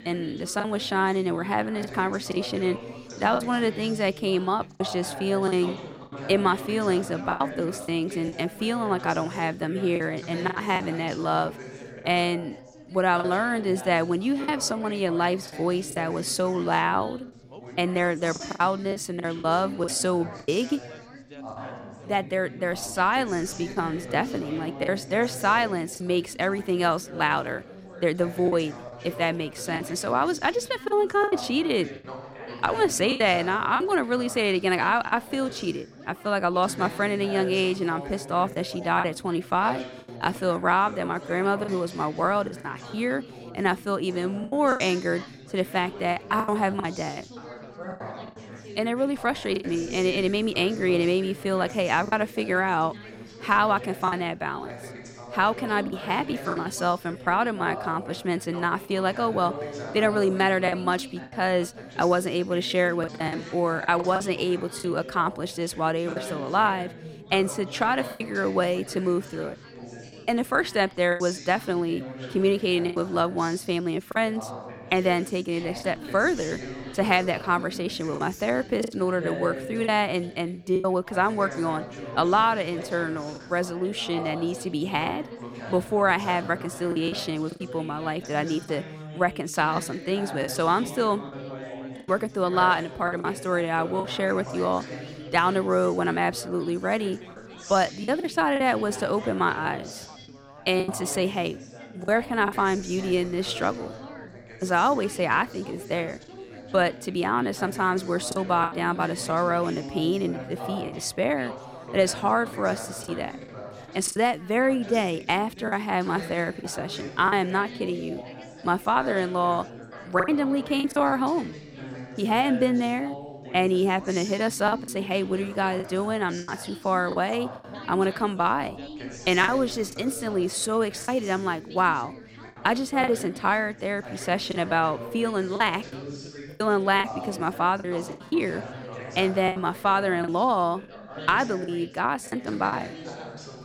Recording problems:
background chatter; noticeable; throughout; 4 voices, 15 dB below the speech
choppy; occasionally; 5% of the speech affected

